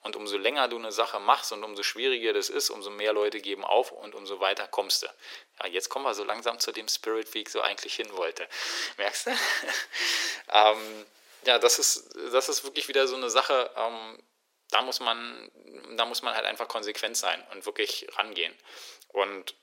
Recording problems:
thin; very; fading below 400 Hz

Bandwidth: 16 kHz